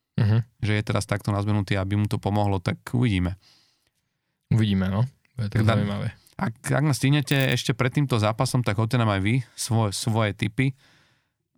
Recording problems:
none

